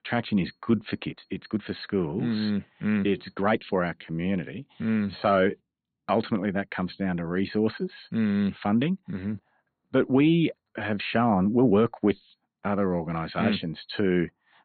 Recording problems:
high frequencies cut off; severe; nothing above 4.5 kHz
uneven, jittery; strongly; from 0.5 to 13 s

